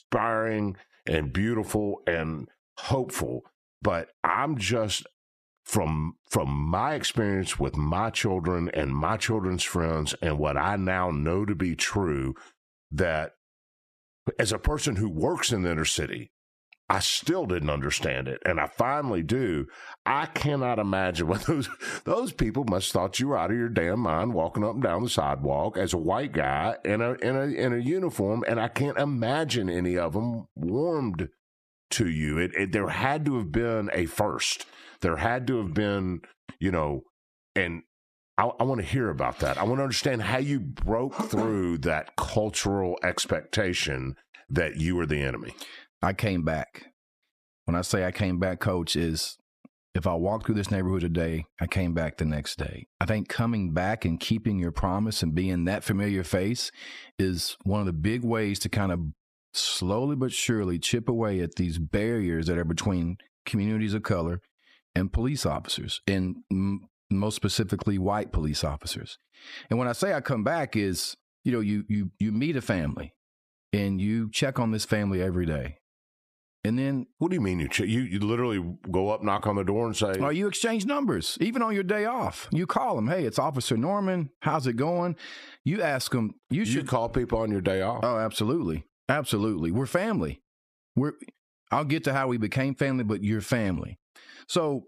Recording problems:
squashed, flat; heavily

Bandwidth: 14.5 kHz